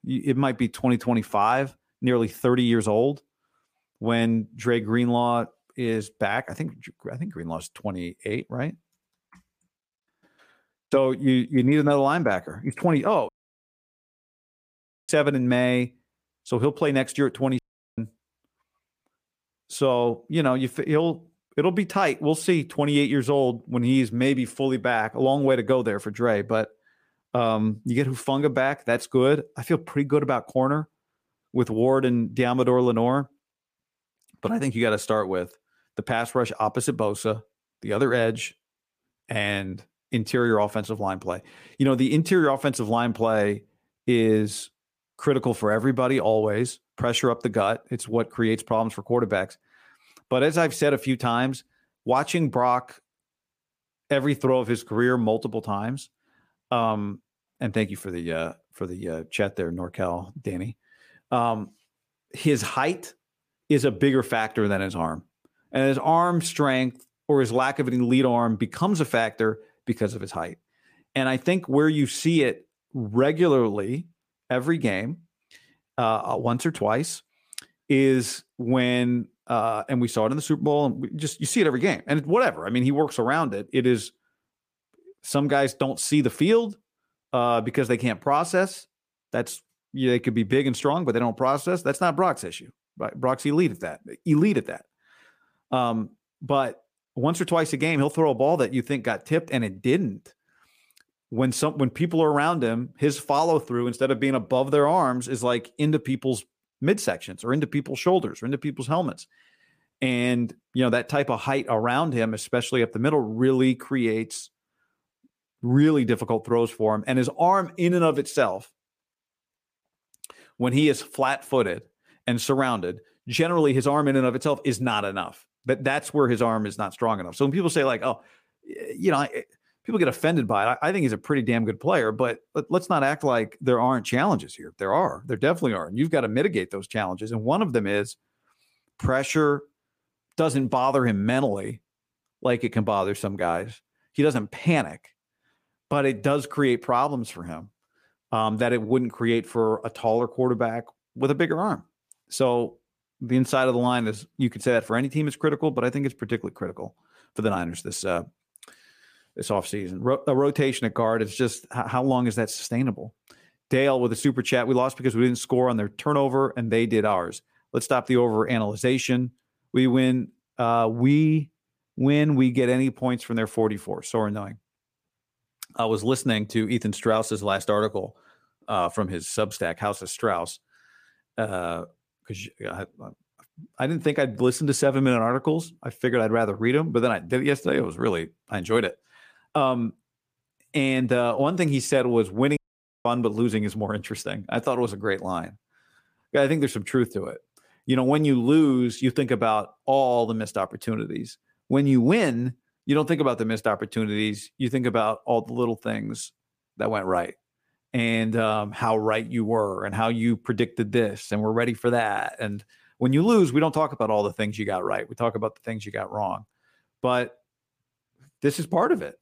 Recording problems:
audio cutting out; at 13 s for 2 s, at 18 s and at 3:13

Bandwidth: 15 kHz